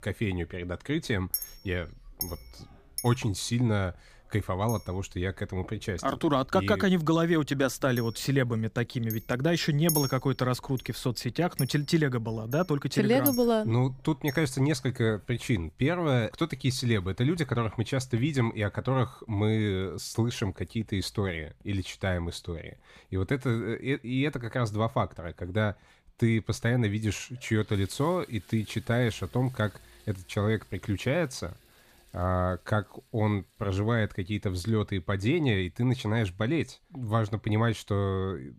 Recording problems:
household noises; loud; throughout; 9 dB below the speech

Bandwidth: 15 kHz